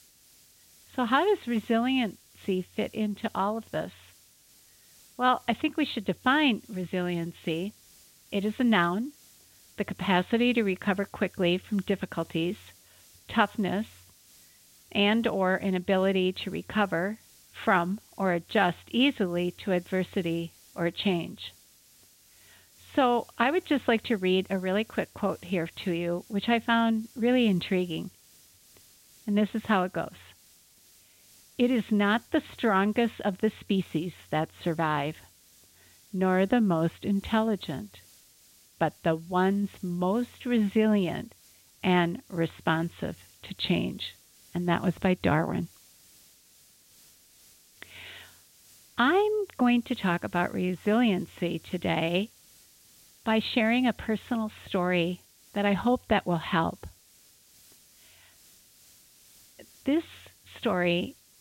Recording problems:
high frequencies cut off; severe; nothing above 4 kHz
hiss; faint; throughout; 25 dB below the speech

